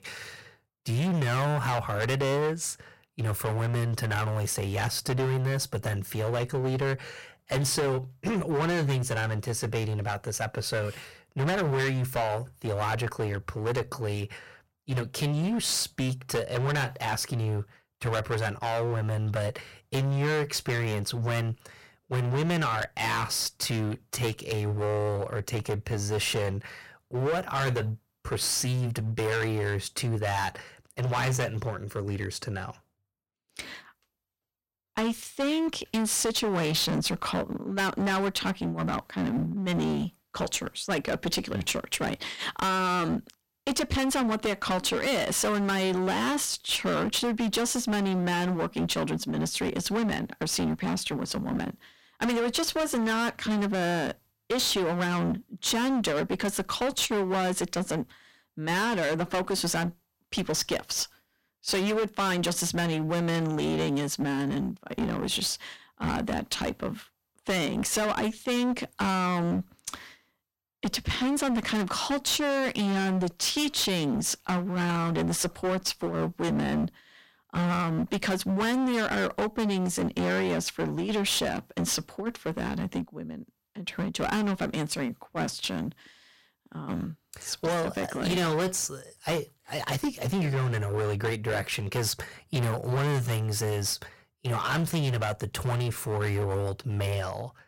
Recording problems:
distortion; heavy; 20% of the sound clipped

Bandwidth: 16.5 kHz